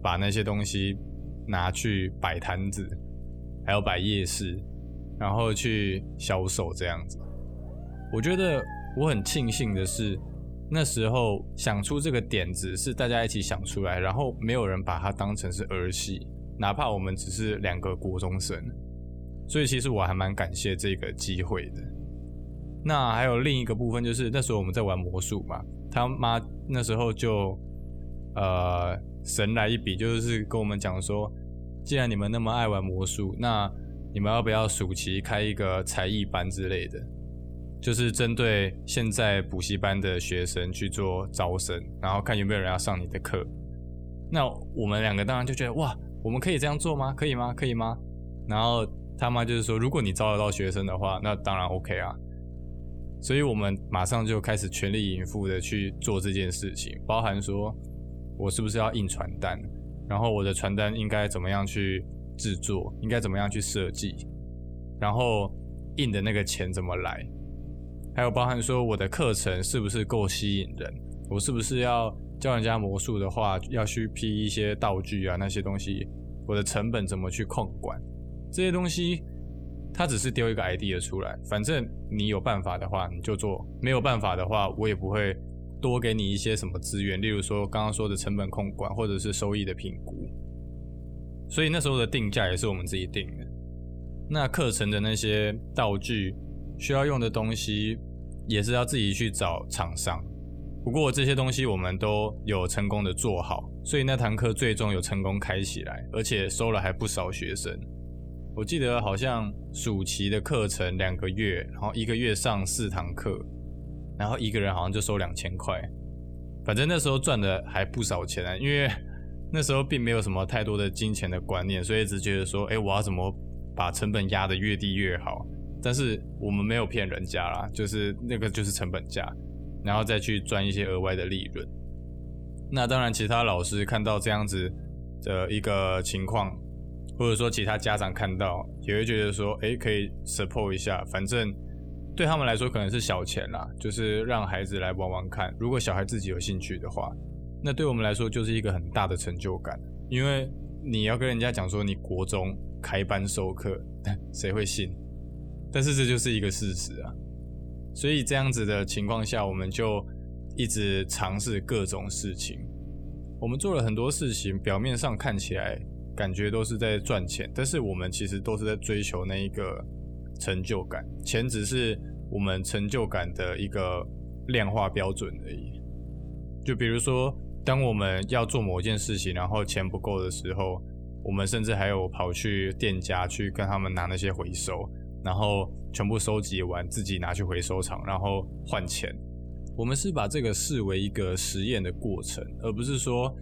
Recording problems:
electrical hum; faint; throughout; 60 Hz, 20 dB below the speech
dog barking; noticeable; from 7 to 10 s; peak 10 dB below the speech

